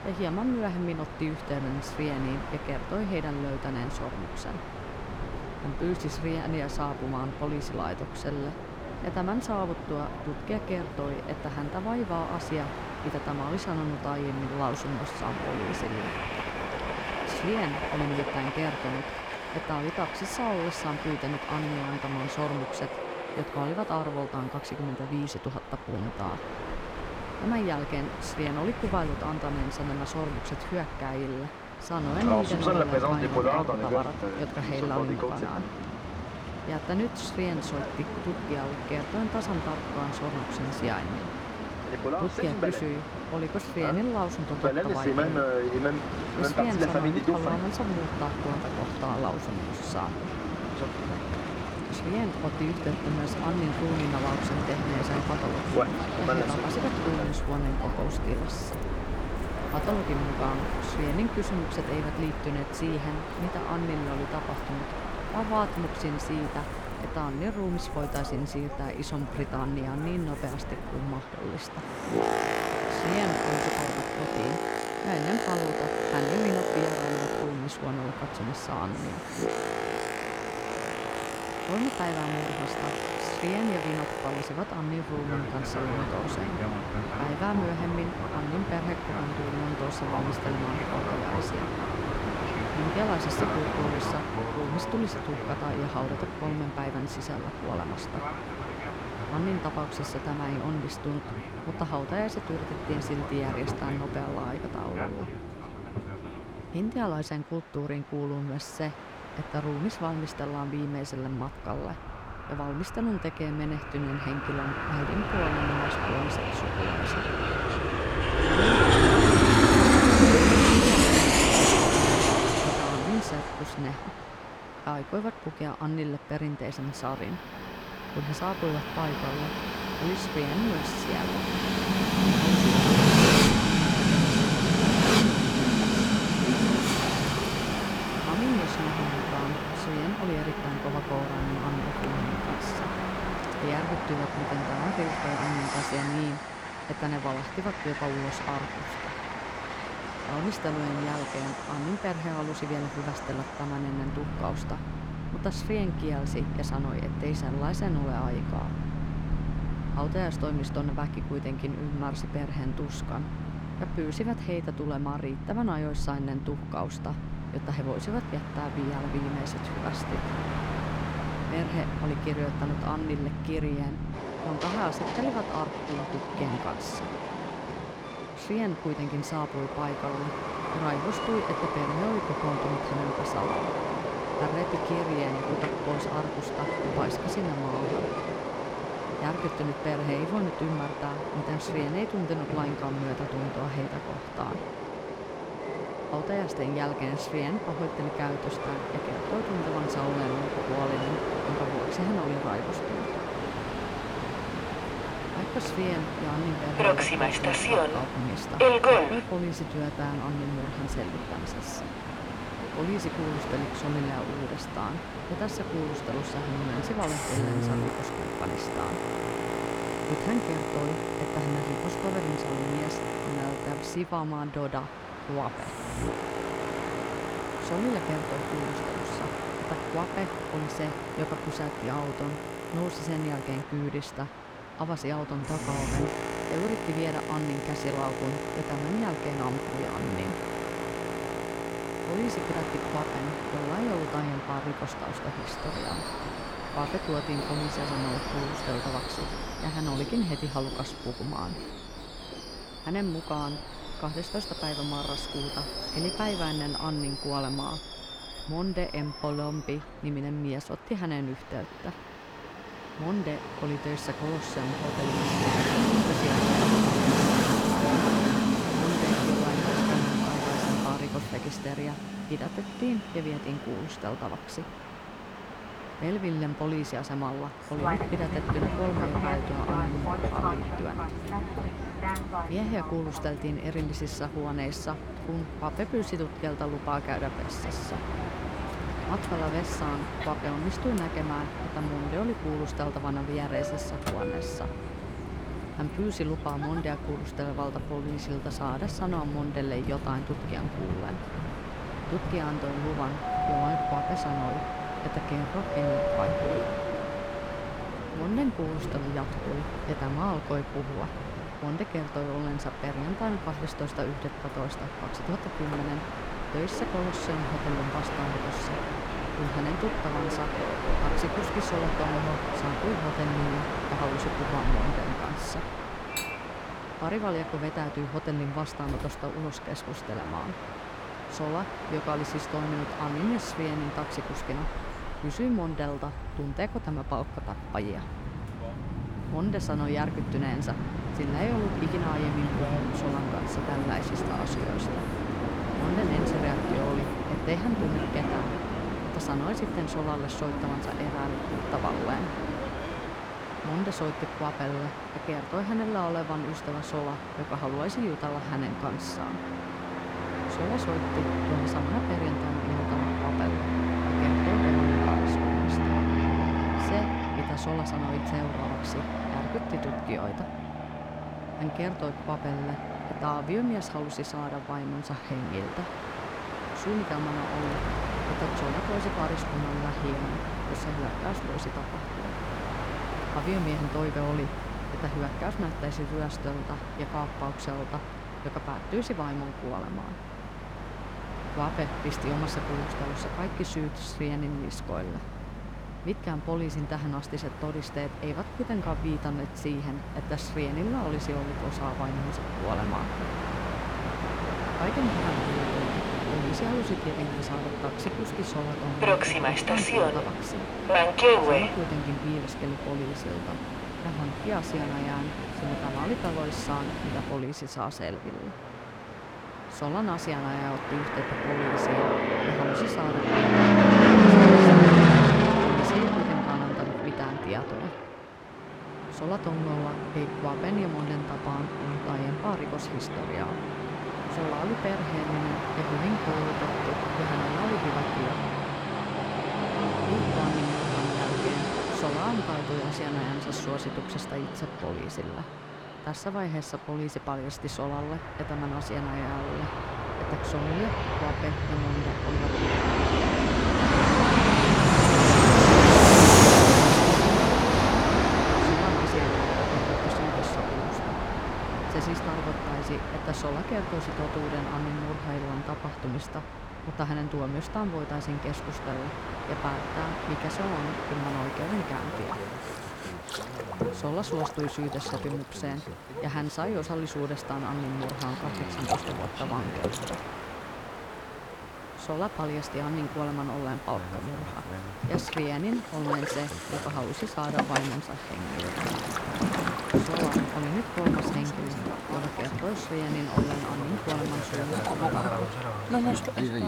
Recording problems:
train or aircraft noise; very loud; throughout; 4 dB above the speech
doorbell; loud; from 5:03 to 5:08; peak 6 dB above the speech
clattering dishes; noticeable; at 5:26; peak 2 dB below the speech
dog barking; faint; at 8:01; peak 15 dB below the speech

